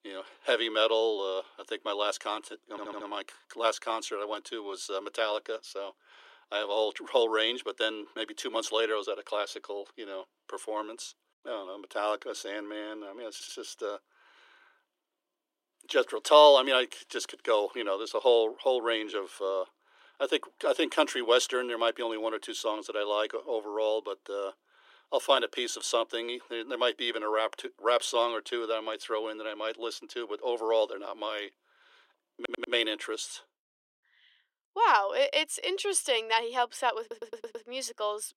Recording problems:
thin; somewhat; fading below 300 Hz
audio stuttering; 4 times, first at 2.5 s

